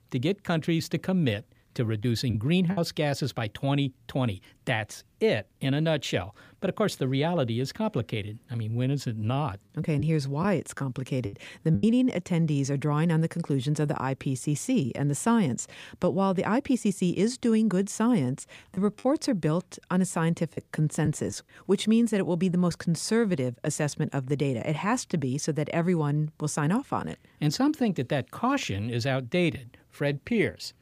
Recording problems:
choppy; very; at 2 s, from 10 to 12 s and from 19 to 21 s; 7% of the speech affected

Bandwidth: 15 kHz